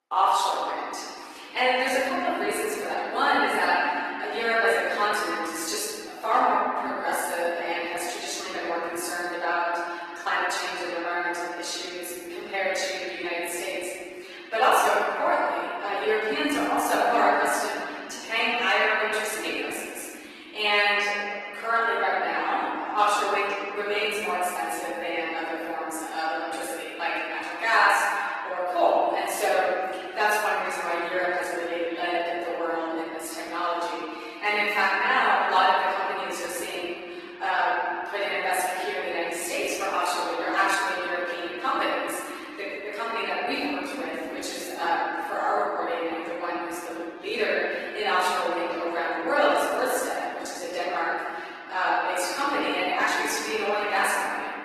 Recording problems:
room echo; strong; dies away in 3 s
off-mic speech; far
thin; somewhat; fading below 350 Hz
garbled, watery; slightly; nothing above 13.5 kHz

